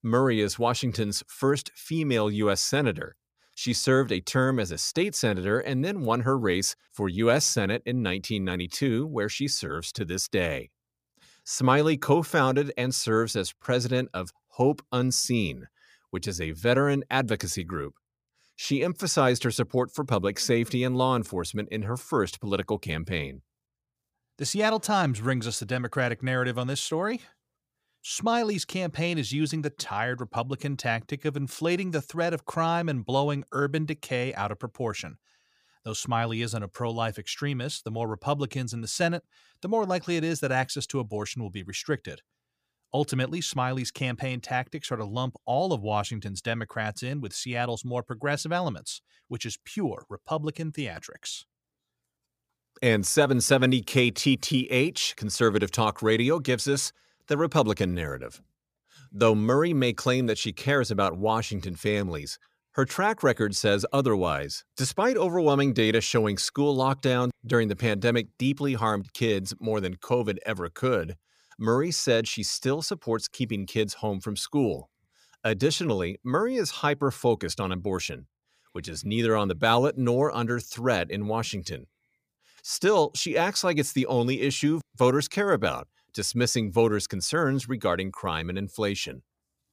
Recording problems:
none

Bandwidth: 15 kHz